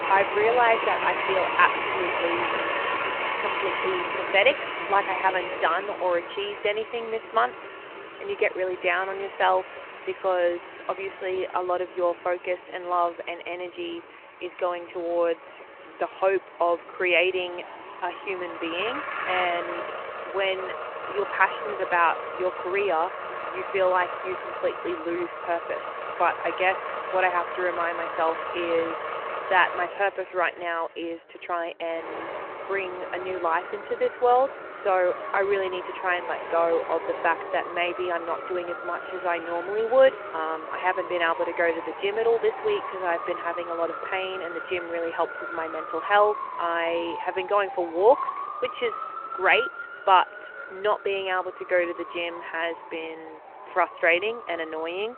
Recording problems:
phone-call audio
traffic noise; loud; throughout; 6 dB below the speech

